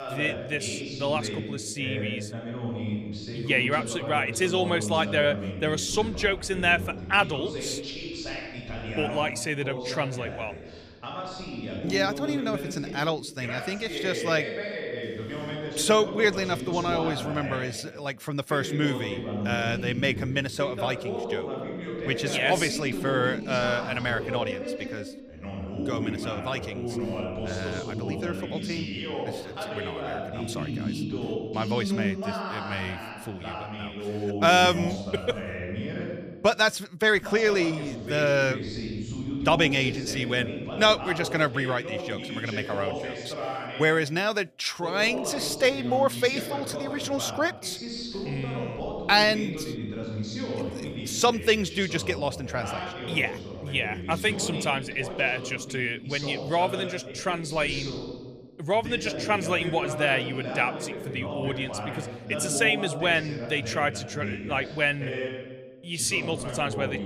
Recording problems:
voice in the background; loud; throughout; 7 dB below the speech

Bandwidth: 14.5 kHz